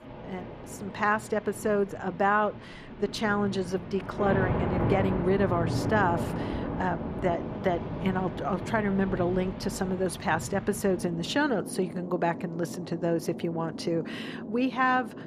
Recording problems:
rain or running water; loud; throughout; 6 dB below the speech

